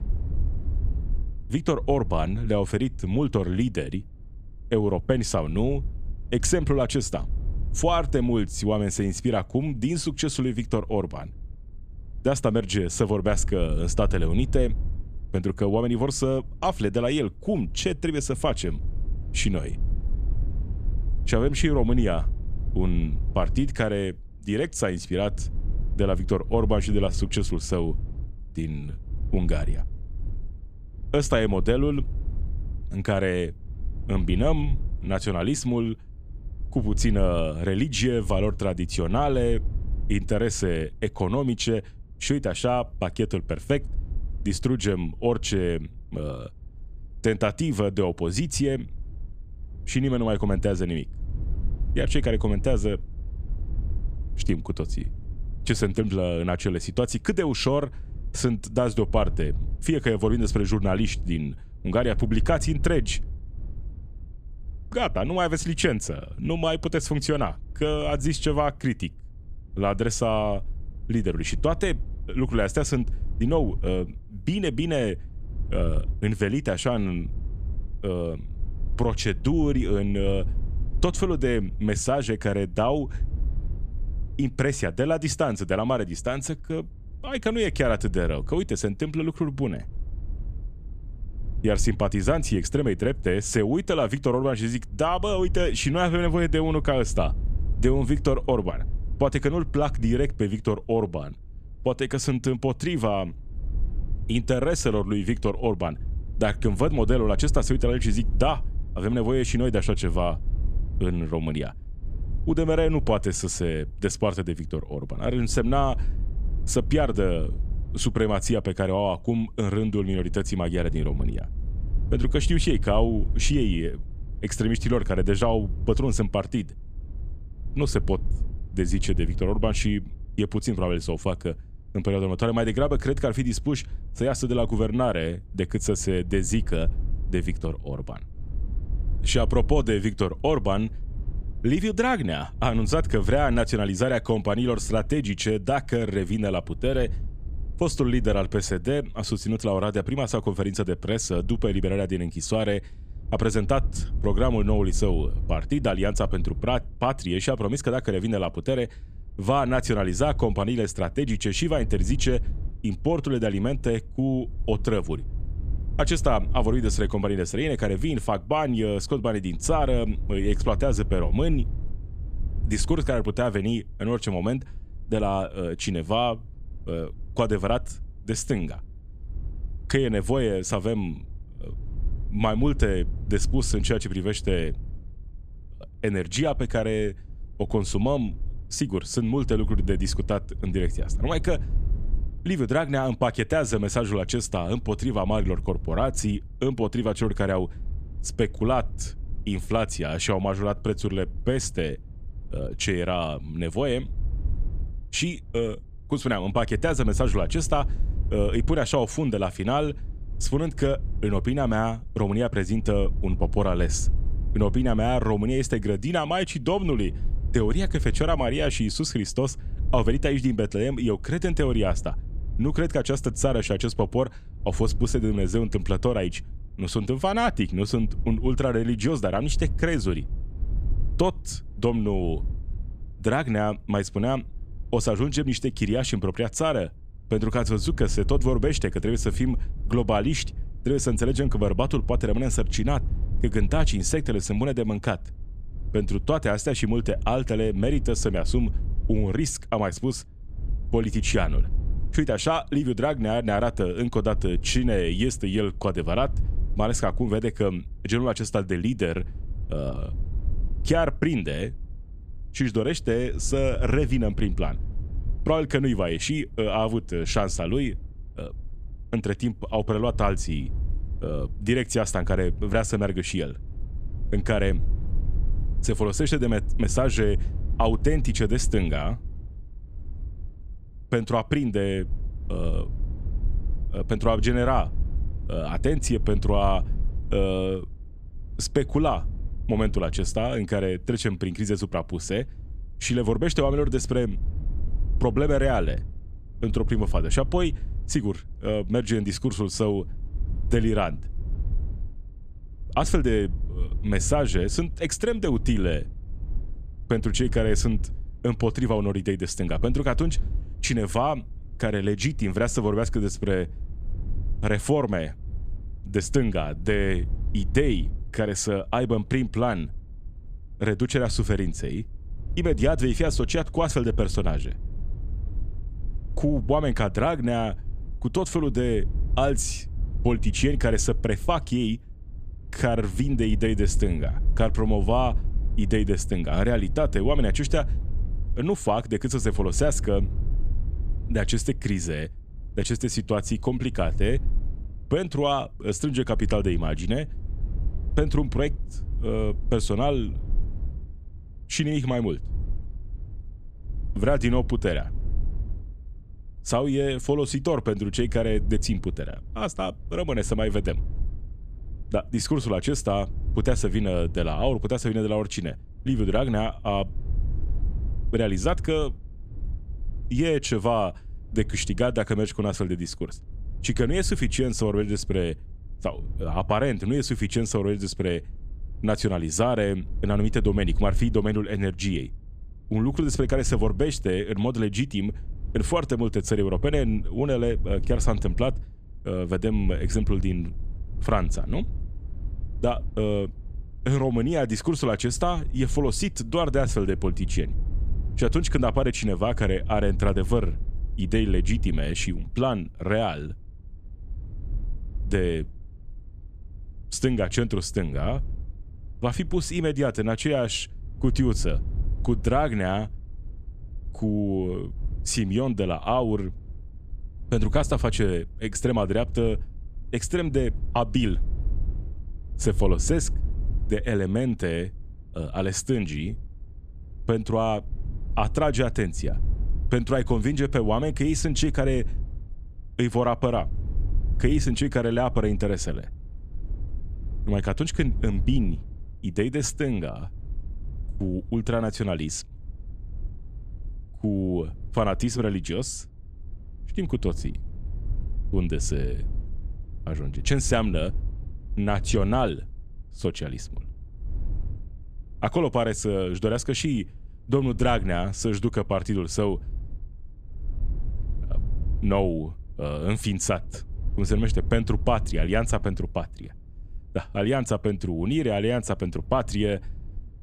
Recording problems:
wind noise on the microphone; occasional gusts; 25 dB below the speech

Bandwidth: 14.5 kHz